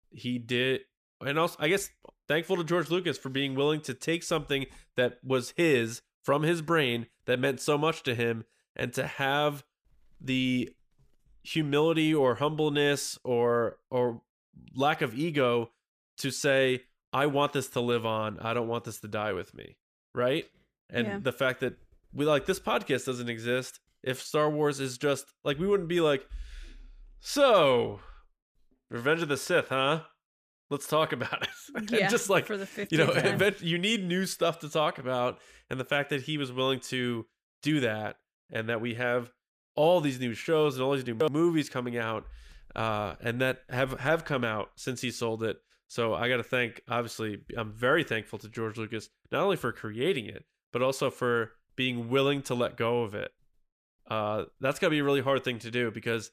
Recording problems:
none

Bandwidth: 15 kHz